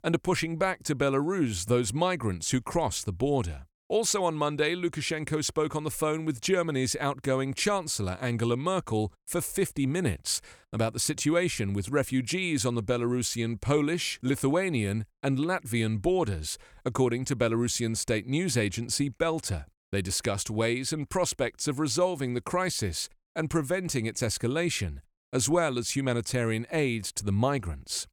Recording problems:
none

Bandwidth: 18 kHz